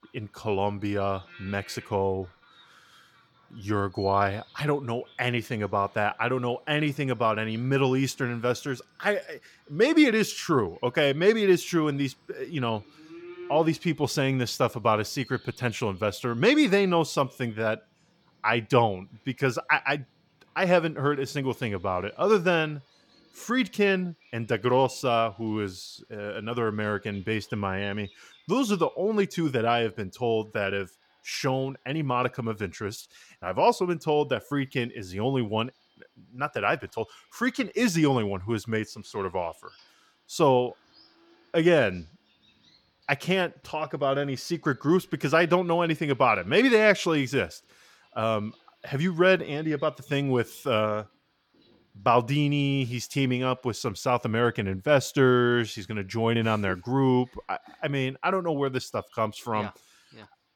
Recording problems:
animal sounds; faint; throughout; 30 dB below the speech

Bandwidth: 17.5 kHz